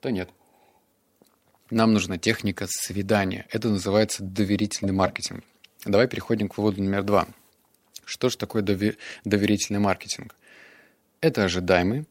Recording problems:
none

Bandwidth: 16 kHz